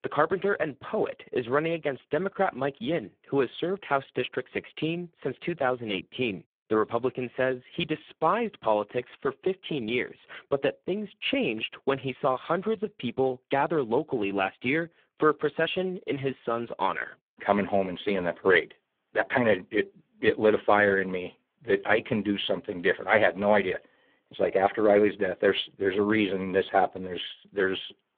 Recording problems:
phone-call audio; poor line

